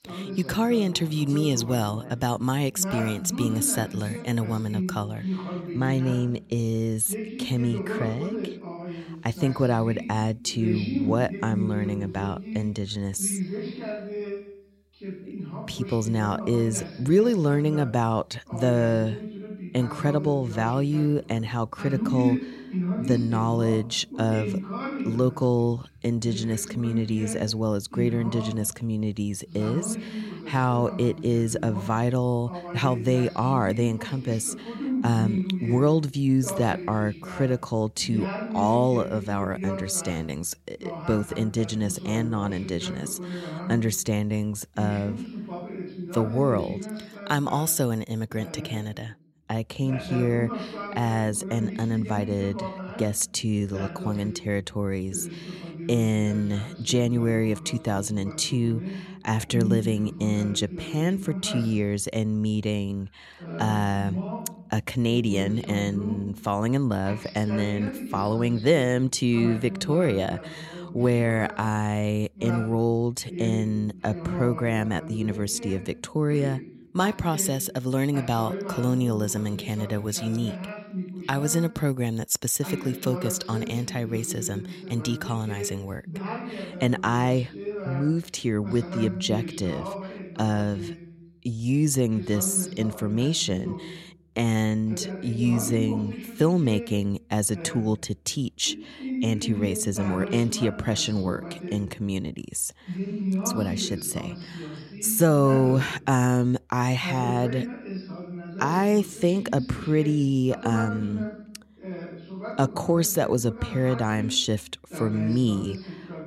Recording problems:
voice in the background; loud; throughout; 9 dB below the speech

